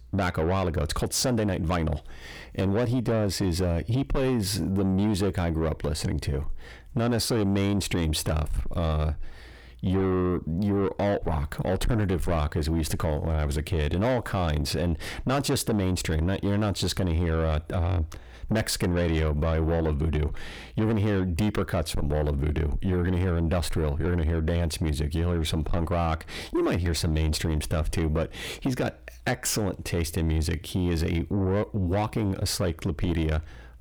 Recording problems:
distortion; slight; 10 dB below the speech

